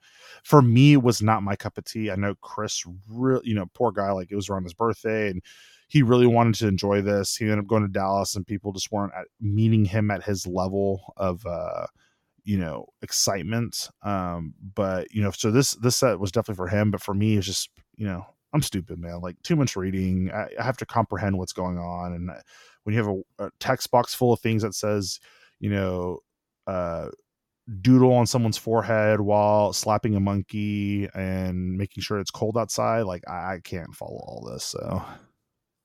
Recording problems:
none

